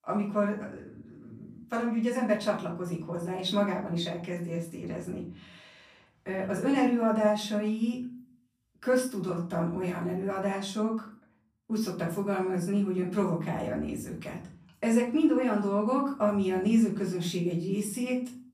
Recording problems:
off-mic speech; far
room echo; slight; dies away in 0.5 s

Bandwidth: 14.5 kHz